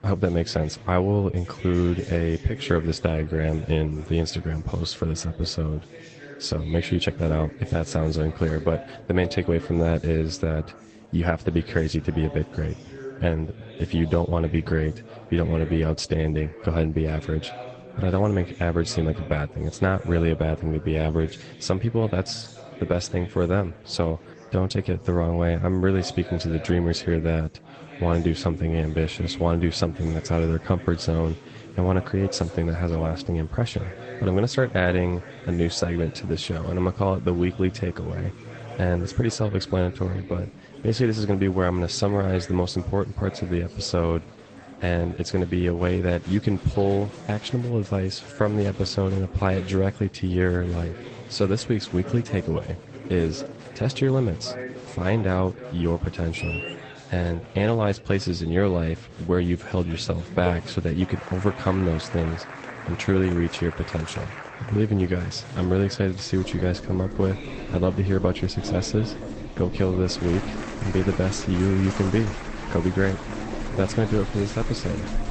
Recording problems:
garbled, watery; slightly; nothing above 8 kHz
household noises; noticeable; throughout; 15 dB below the speech
murmuring crowd; noticeable; throughout; 15 dB below the speech

